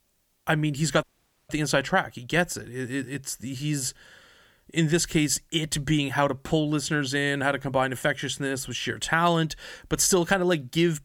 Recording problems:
audio cutting out; at 1 s

